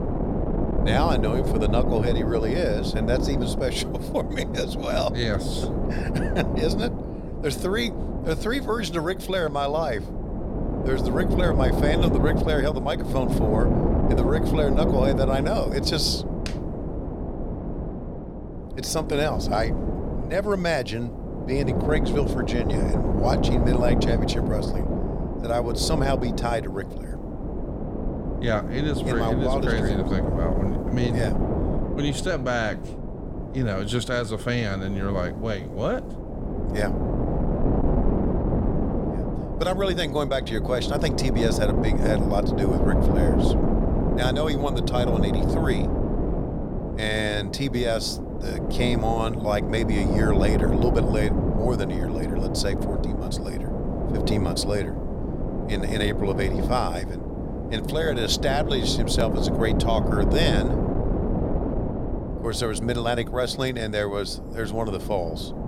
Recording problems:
wind noise on the microphone; heavy; 4 dB below the speech

